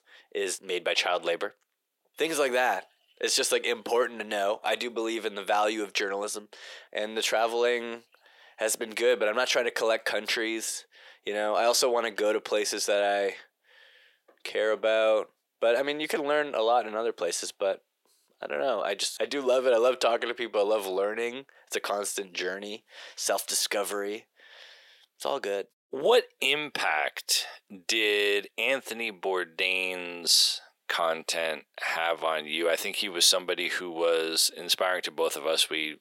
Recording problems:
thin; very; fading below 400 Hz

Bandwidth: 16.5 kHz